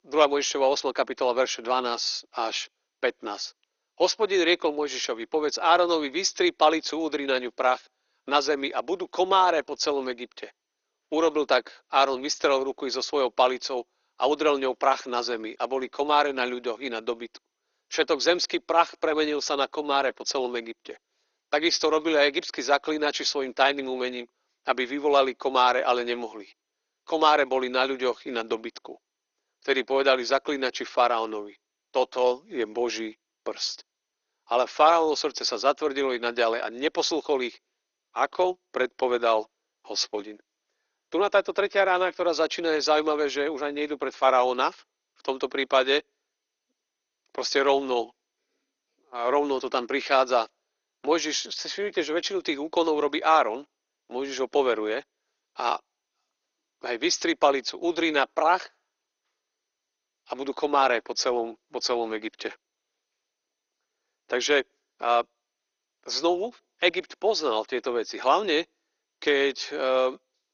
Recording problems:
thin; somewhat; fading below 350 Hz
garbled, watery; slightly; nothing above 6.5 kHz

